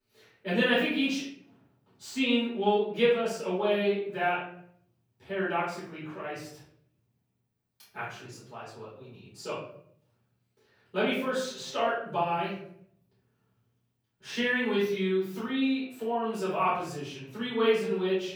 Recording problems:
off-mic speech; far
room echo; noticeable; dies away in 0.6 s

